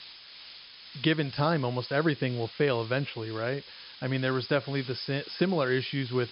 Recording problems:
high frequencies cut off; noticeable; nothing above 5.5 kHz
hiss; noticeable; throughout; 15 dB below the speech

